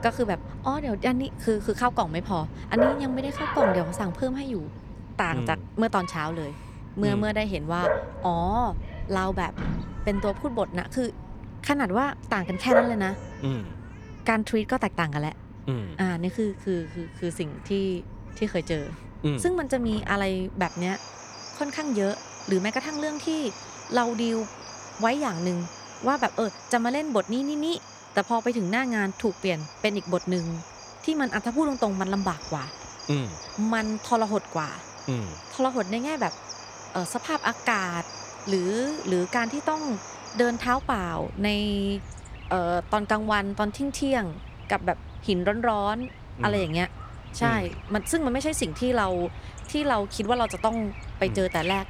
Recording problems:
animal sounds; loud; throughout; 9 dB below the speech

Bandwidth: 18.5 kHz